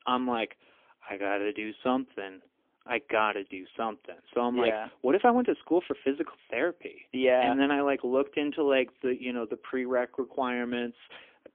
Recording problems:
phone-call audio; poor line; nothing above 3.5 kHz

